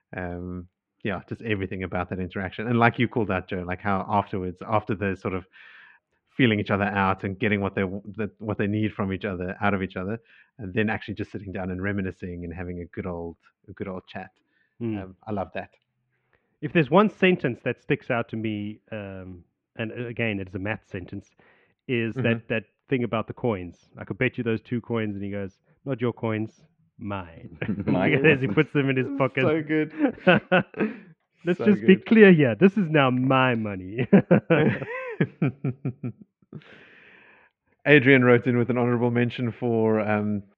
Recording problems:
muffled; very; fading above 2.5 kHz

